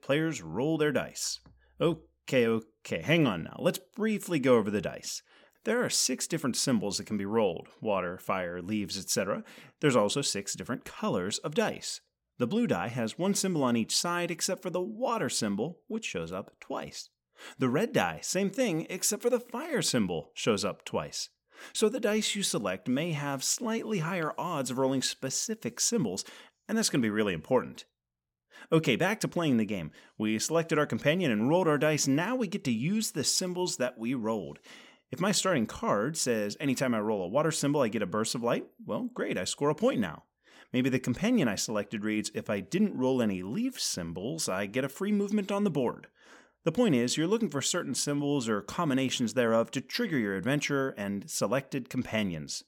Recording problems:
none

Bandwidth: 17.5 kHz